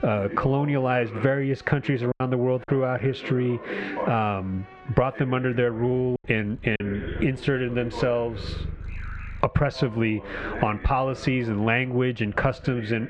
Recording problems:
muffled; very slightly; fading above 2.5 kHz
squashed, flat; somewhat, background pumping
animal sounds; noticeable; throughout; 20 dB below the speech
voice in the background; noticeable; throughout; 15 dB below the speech
choppy; very; at 2 s and at 6 s; 7% of the speech affected

